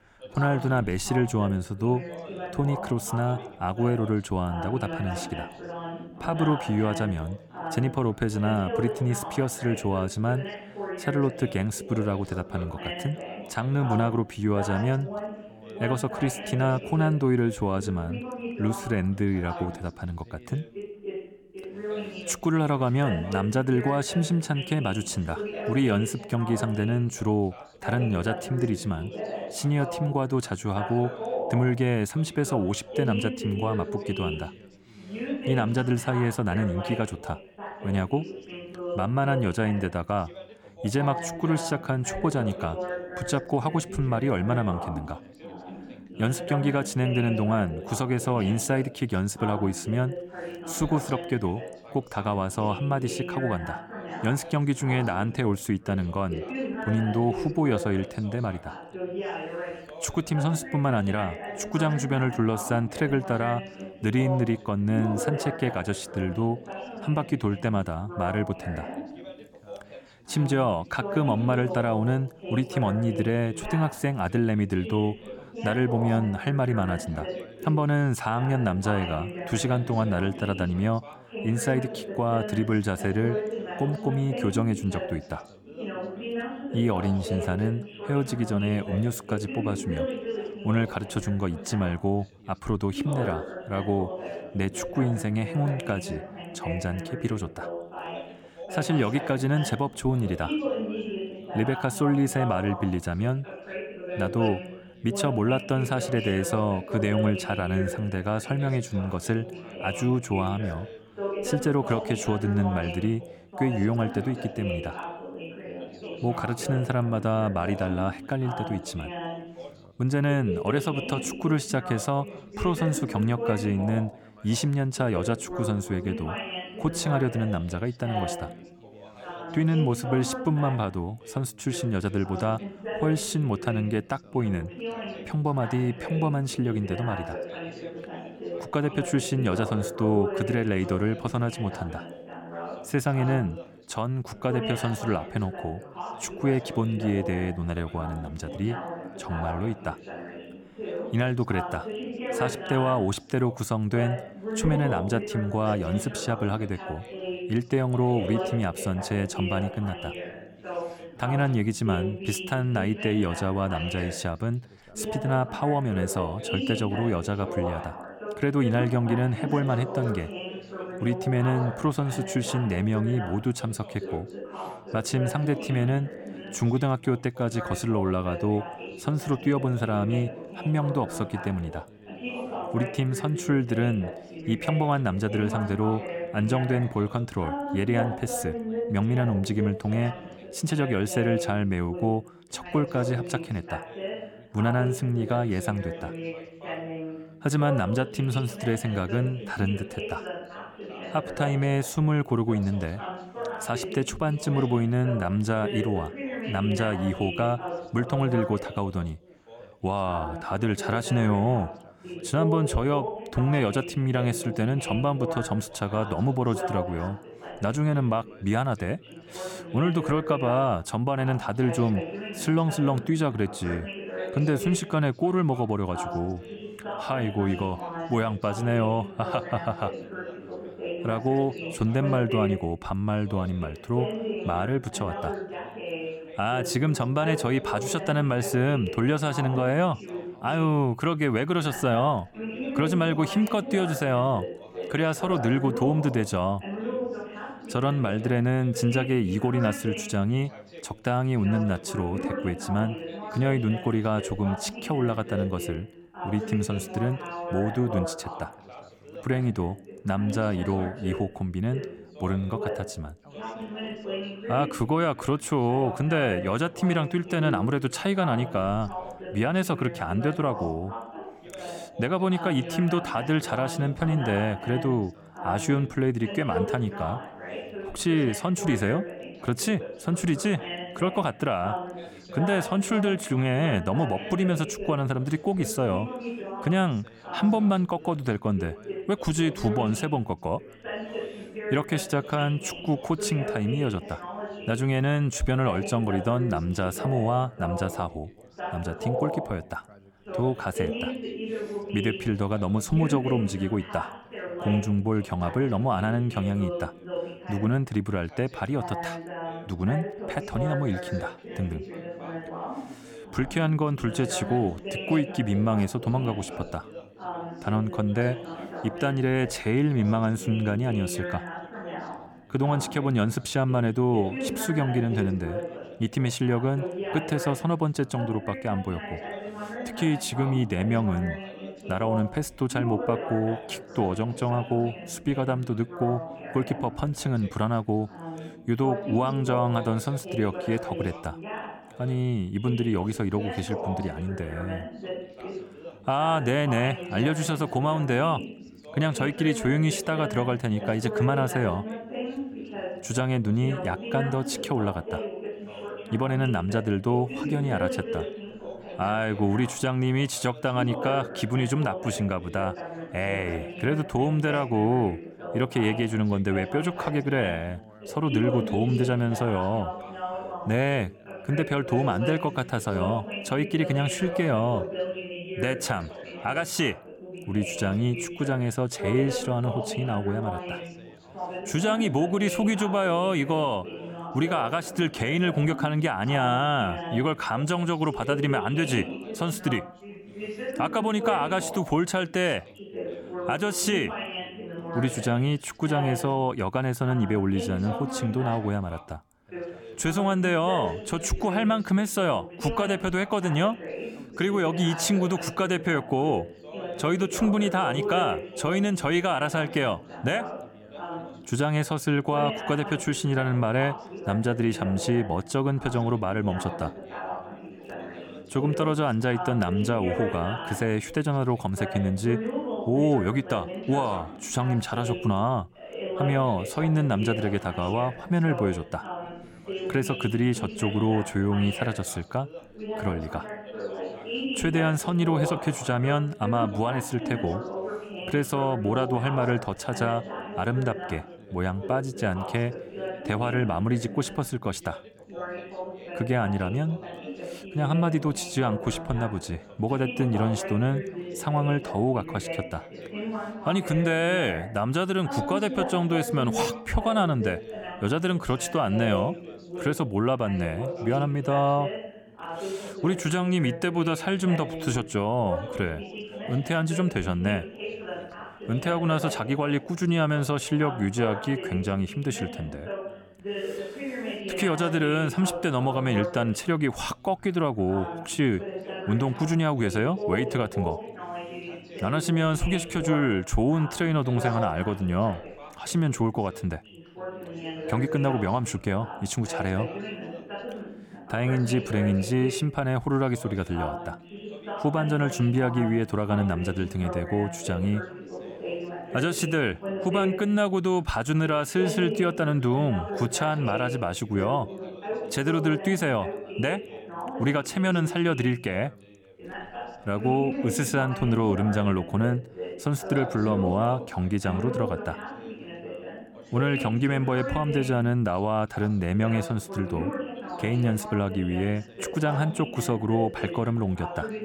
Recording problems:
background chatter; loud; throughout; 3 voices, 9 dB below the speech

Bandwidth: 17.5 kHz